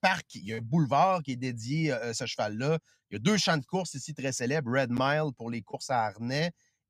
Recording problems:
none

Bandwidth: 15 kHz